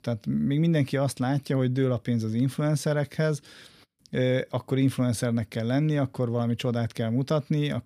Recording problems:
none

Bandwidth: 15 kHz